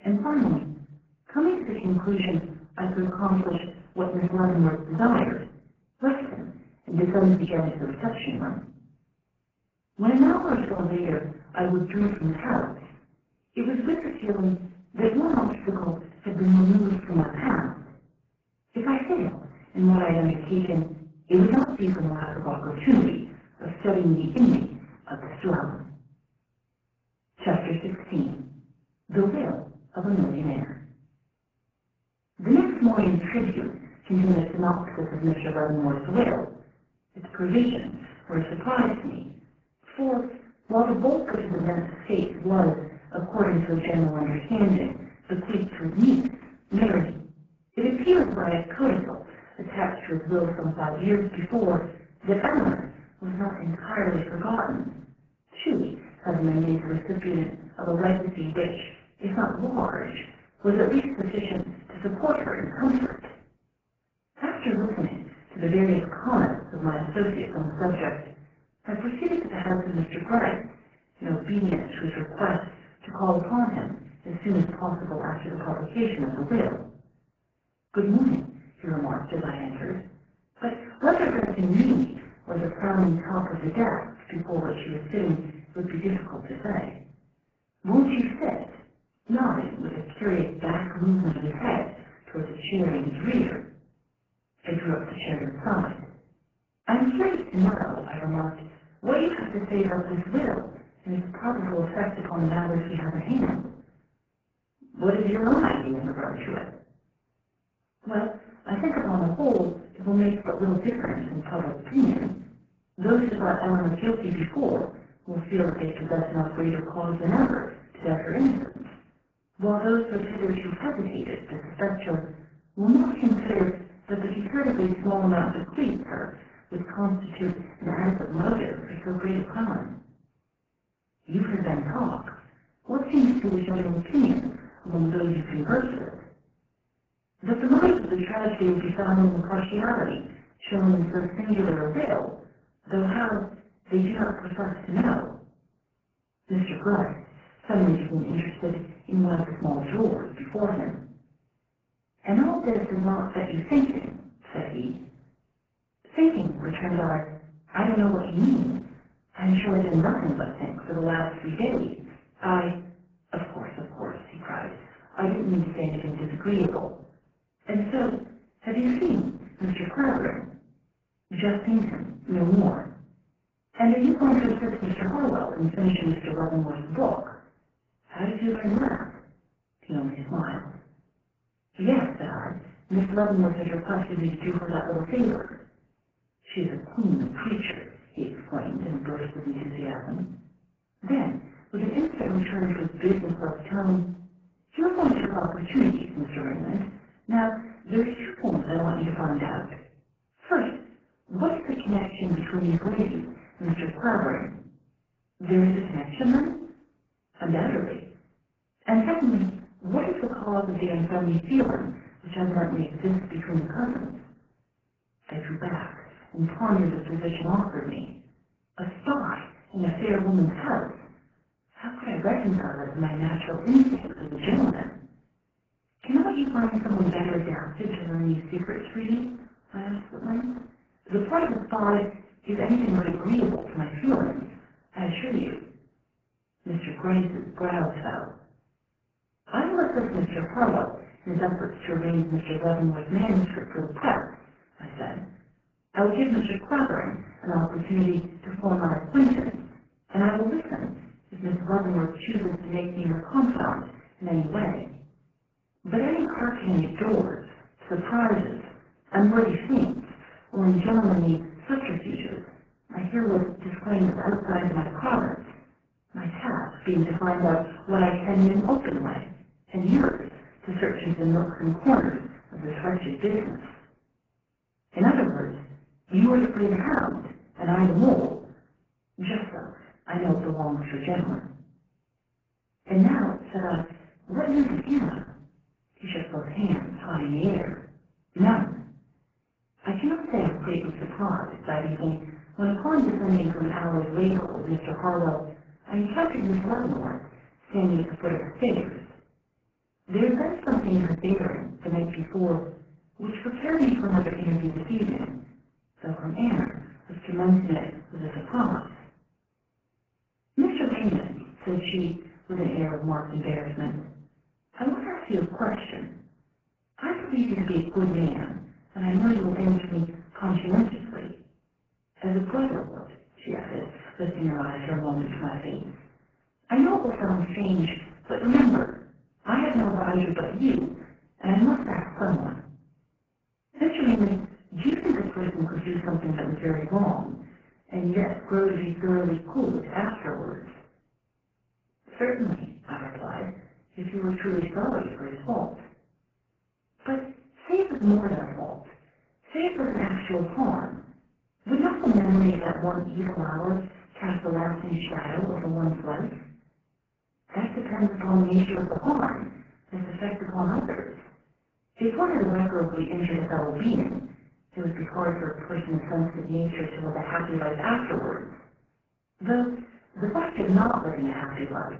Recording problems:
off-mic speech; far
garbled, watery; badly
room echo; slight; dies away in 0.4 s

